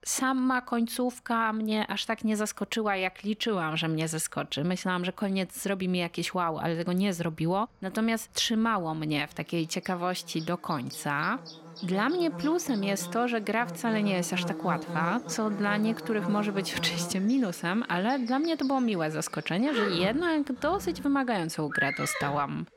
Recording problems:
animal sounds; loud; throughout; 9 dB below the speech

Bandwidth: 16.5 kHz